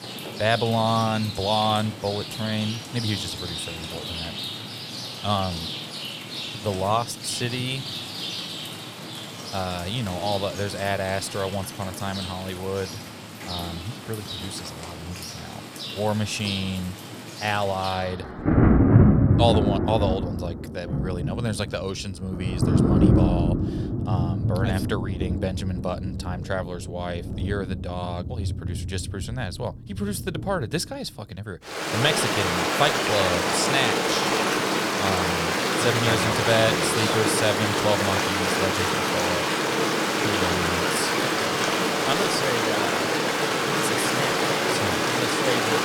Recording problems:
rain or running water; very loud; throughout; 3 dB above the speech

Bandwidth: 18.5 kHz